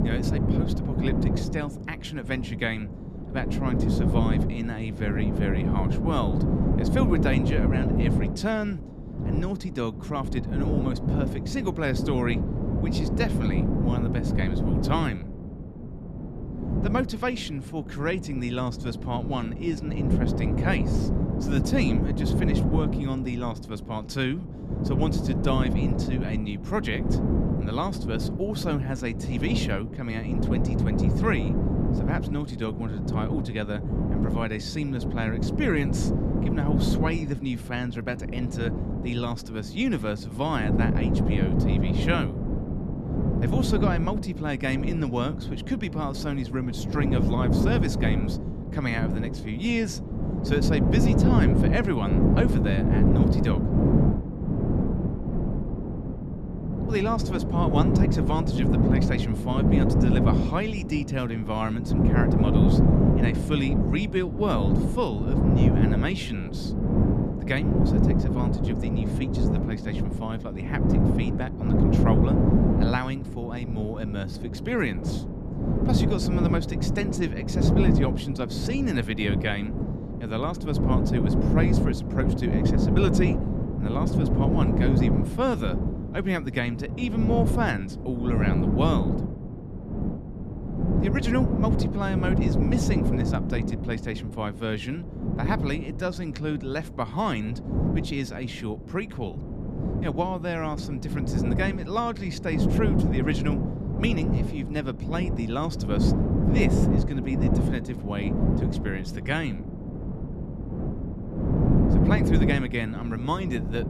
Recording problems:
wind noise on the microphone; heavy; 1 dB below the speech

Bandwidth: 13.5 kHz